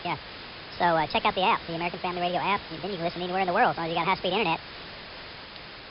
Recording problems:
wrong speed and pitch; too fast and too high; 1.6 times normal speed
high frequencies cut off; noticeable; nothing above 5 kHz
hiss; noticeable; throughout; 15 dB below the speech

